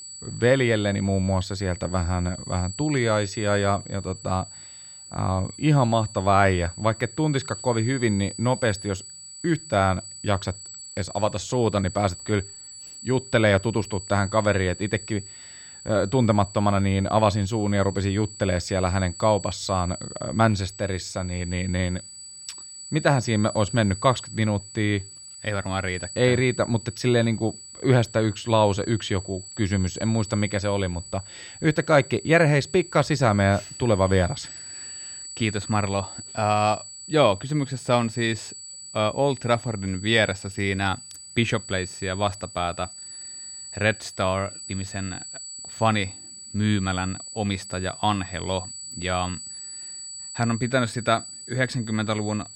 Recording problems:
high-pitched whine; noticeable; throughout; 8 kHz, 15 dB below the speech

